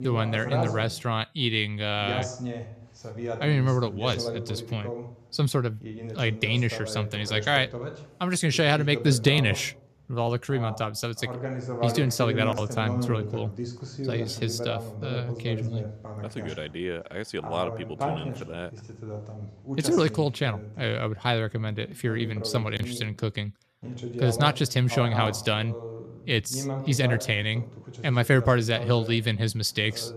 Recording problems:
voice in the background; loud; throughout; 9 dB below the speech

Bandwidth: 14.5 kHz